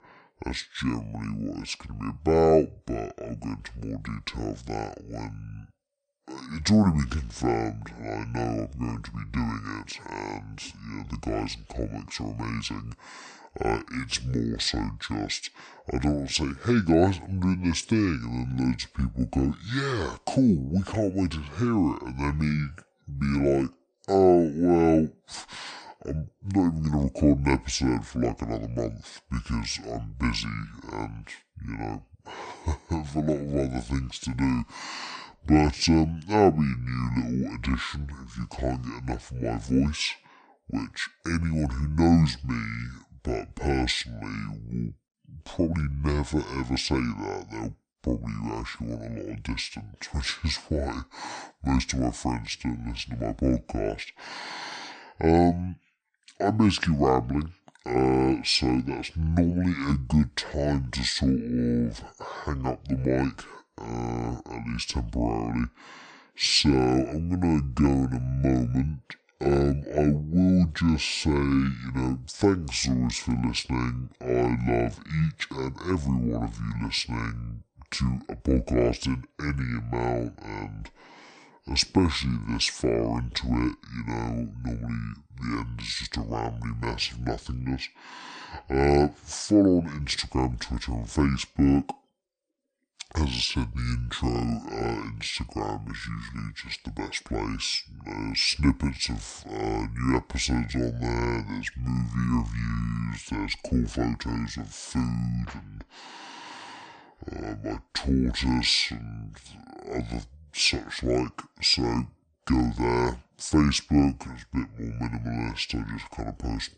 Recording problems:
wrong speed and pitch; too slow and too low; 0.6 times normal speed

